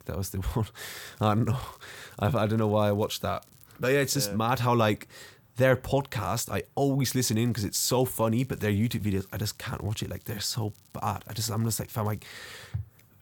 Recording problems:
crackling; faint; from 1 to 3.5 s and from 7 to 12 s; 30 dB below the speech

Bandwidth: 18 kHz